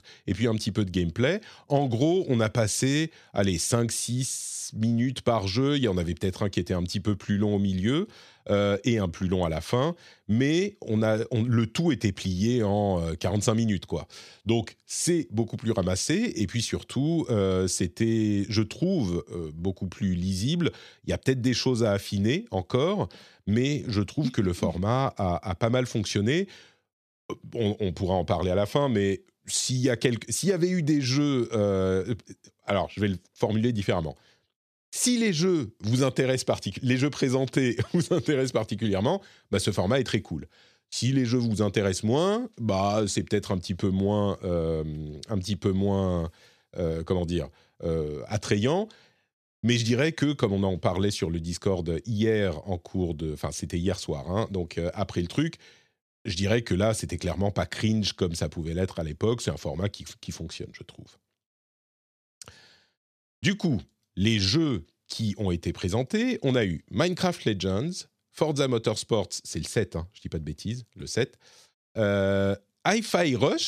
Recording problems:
abrupt cut into speech; at the end

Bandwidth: 14 kHz